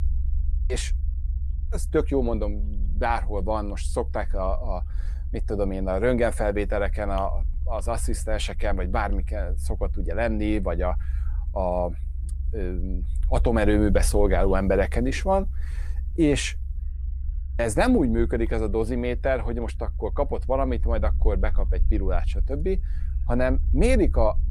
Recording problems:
low rumble; faint; throughout; 25 dB below the speech

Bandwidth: 15 kHz